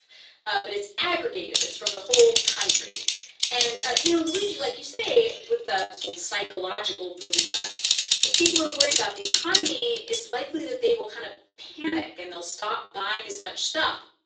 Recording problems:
off-mic speech; far
thin; somewhat; fading below 350 Hz
room echo; slight; dies away in 0.4 s
garbled, watery; slightly; nothing above 7.5 kHz
choppy; very; 16% of the speech affected
keyboard typing; loud; from 1.5 to 10 s; peak 7 dB above the speech

